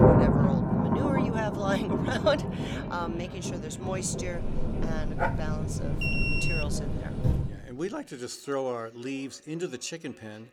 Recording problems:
echo of what is said; faint; throughout; 510 ms later, 20 dB below the speech
rain or running water; very loud; until 7.5 s; 5 dB above the speech
dog barking; loud; at 5 s; peak 2 dB above the speech
alarm; loud; at 6 s; peak 5 dB above the speech
door banging; loud; at 7 s; peak 5 dB above the speech

